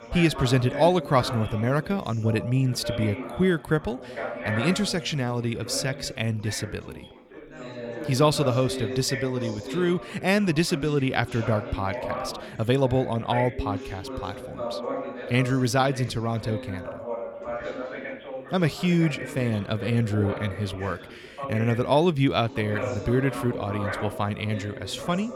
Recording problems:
background chatter; loud; throughout; 4 voices, 10 dB below the speech

